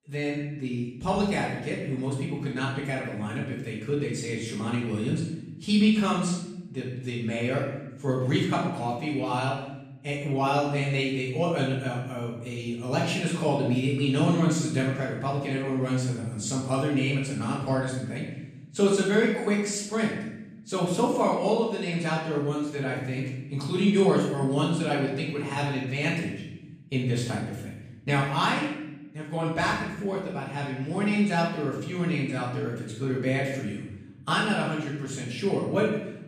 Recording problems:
off-mic speech; far
room echo; noticeable; dies away in 0.9 s

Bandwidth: 14.5 kHz